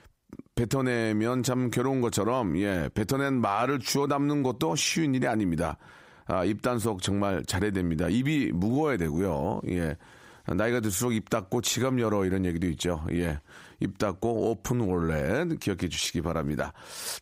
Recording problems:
squashed, flat; heavily

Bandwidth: 15.5 kHz